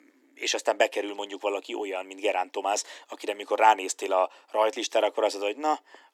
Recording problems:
thin; somewhat; fading below 300 Hz

